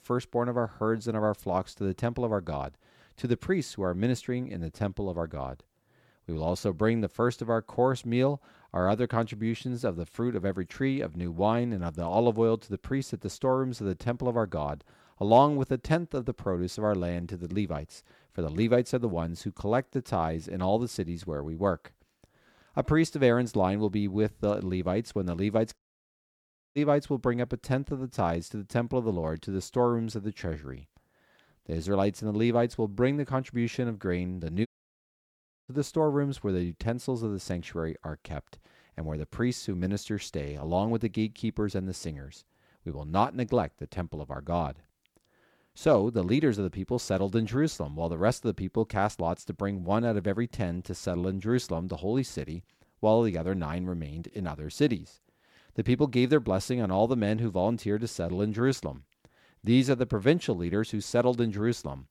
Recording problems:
audio cutting out; at 26 s for 1 s and at 35 s for 1 s

